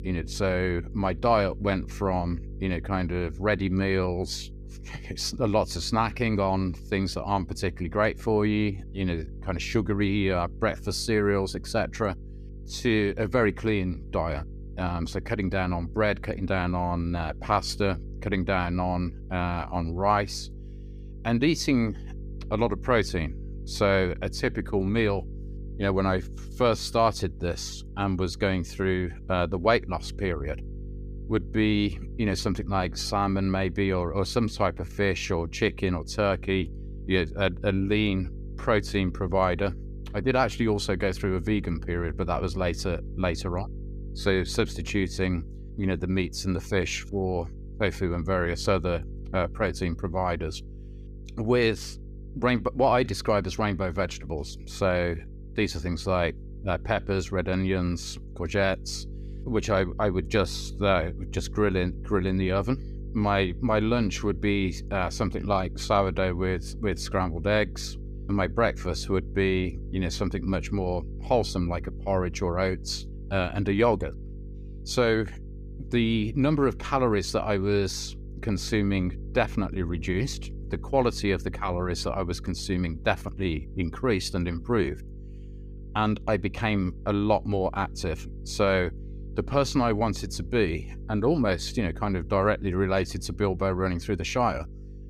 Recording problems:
electrical hum; faint; throughout; 50 Hz, 25 dB below the speech

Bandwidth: 15 kHz